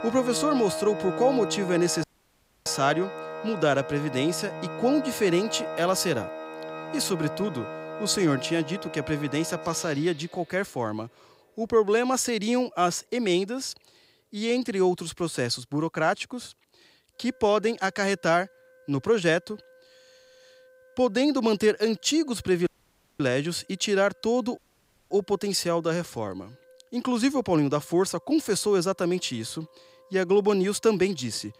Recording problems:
background music; loud; throughout; 10 dB below the speech
audio cutting out; at 2 s for 0.5 s, at 23 s for 0.5 s and at 25 s for 0.5 s

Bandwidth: 15.5 kHz